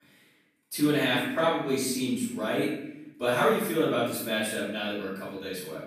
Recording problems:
off-mic speech; far
room echo; noticeable; dies away in 0.8 s

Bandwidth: 15 kHz